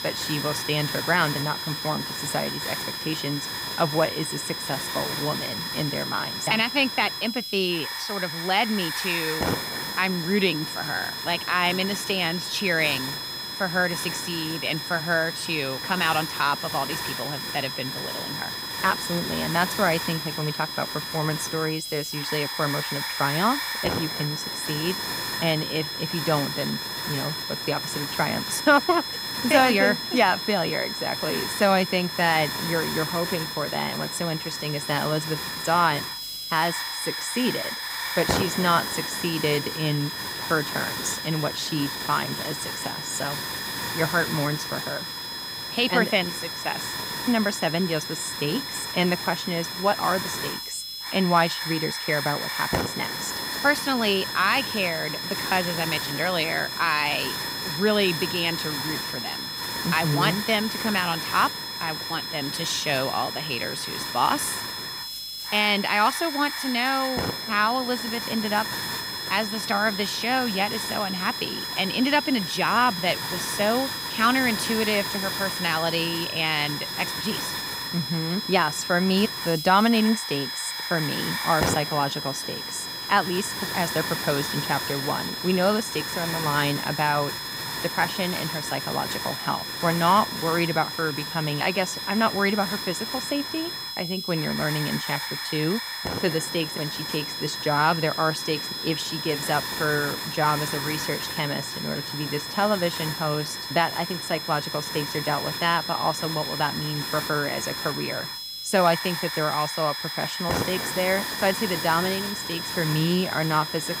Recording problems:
high-pitched whine; loud; throughout; 5 kHz, 6 dB below the speech
hiss; loud; throughout; 7 dB below the speech

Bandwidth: 15.5 kHz